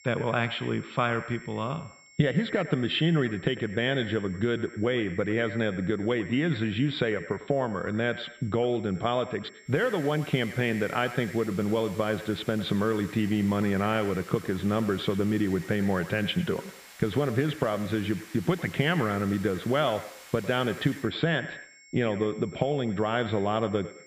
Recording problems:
echo of what is said; noticeable; throughout; 100 ms later, 15 dB below the speech
muffled; slightly; fading above 3.5 kHz
hiss; noticeable; from 9.5 to 21 s; 20 dB below the speech
high-pitched whine; faint; throughout; 2 kHz, 25 dB below the speech

